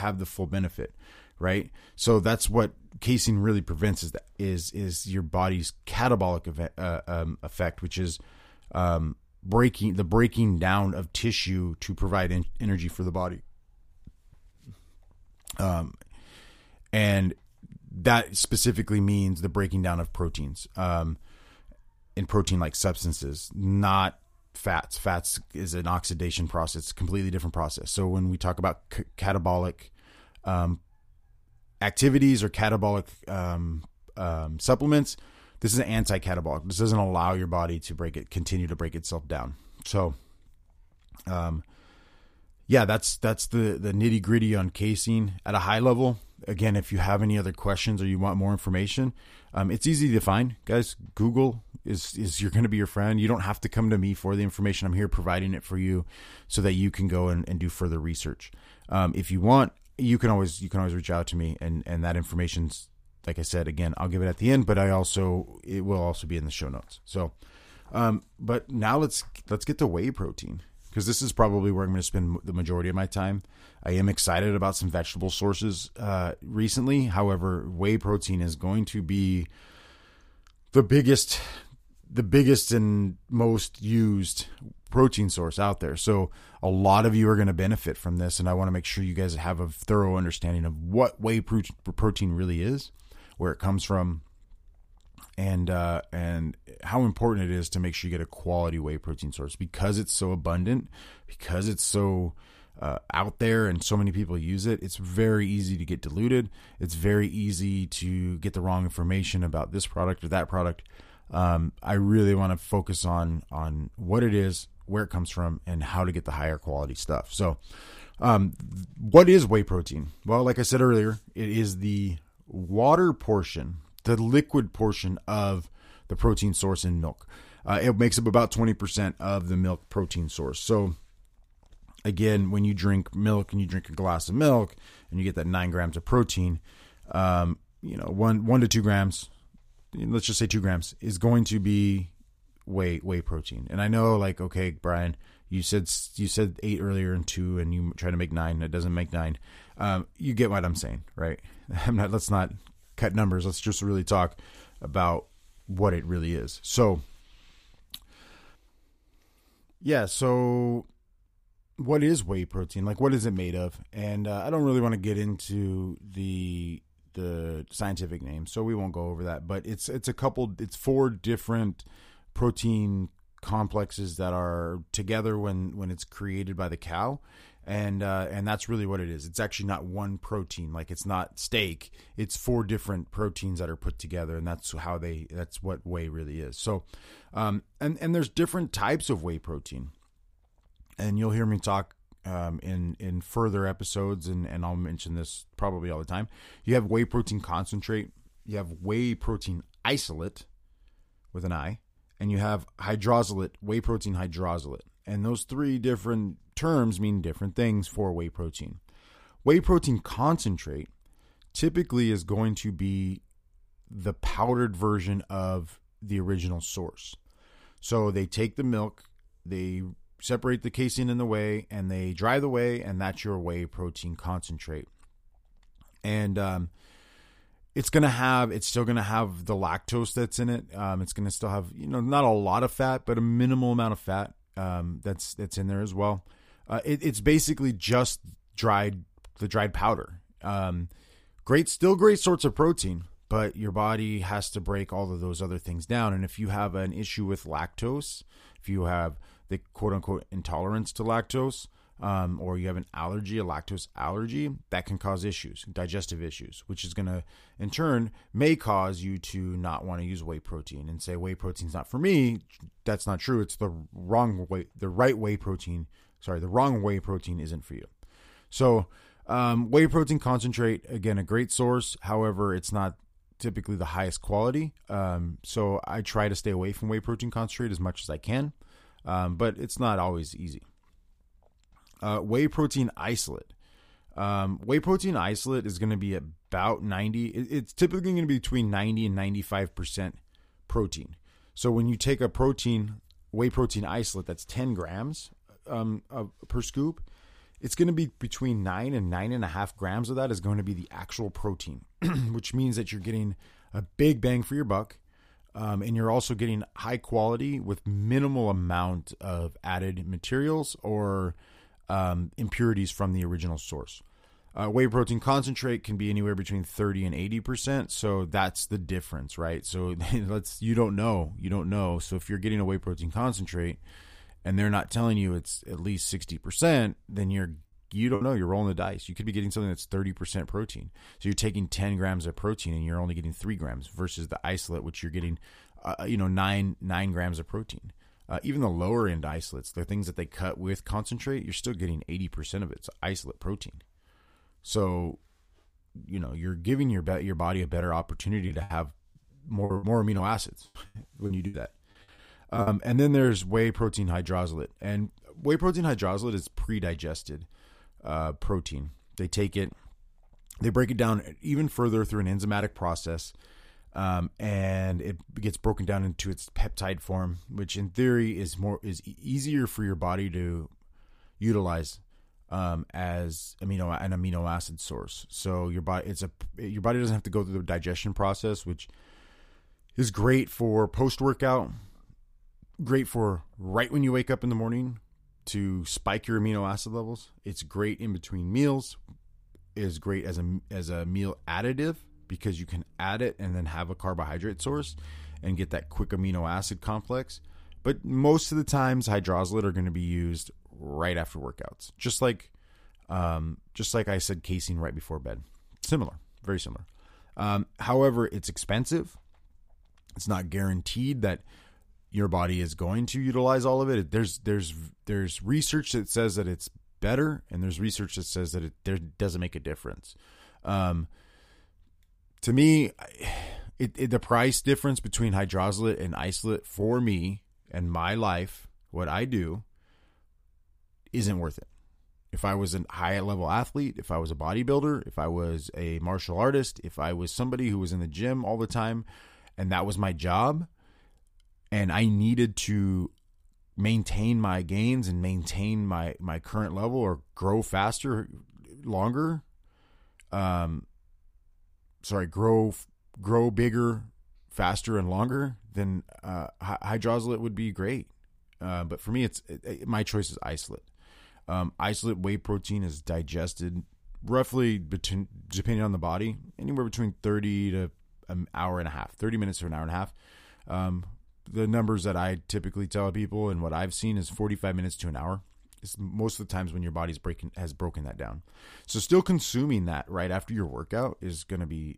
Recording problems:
abrupt cut into speech; at the start
choppy; very; at 5:28 and from 5:48 to 5:53; 13% of the speech affected

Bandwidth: 15 kHz